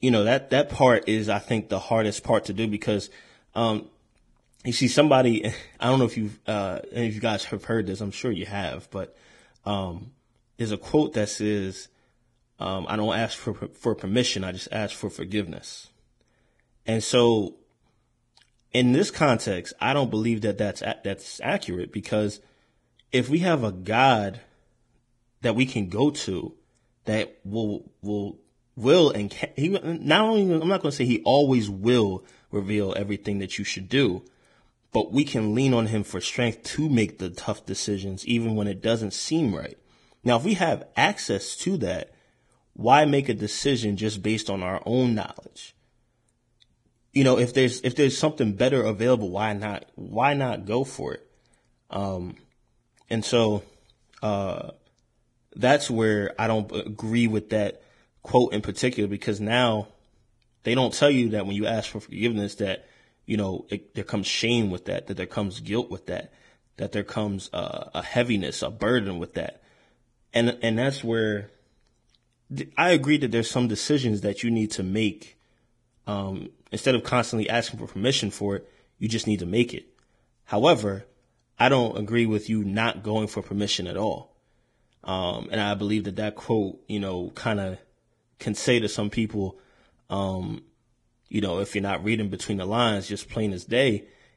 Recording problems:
garbled, watery; badly

